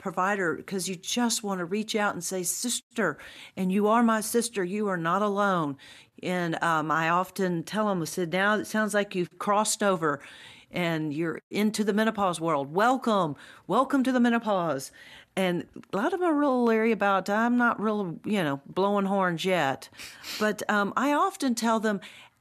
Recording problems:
none

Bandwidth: 13.5 kHz